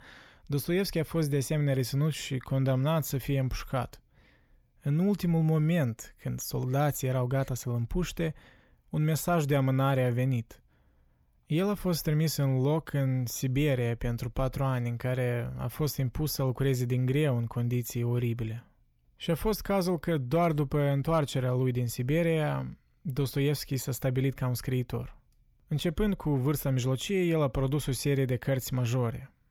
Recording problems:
none

